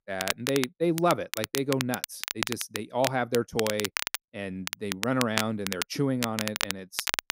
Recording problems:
crackle, like an old record; loud; 3 dB below the speech

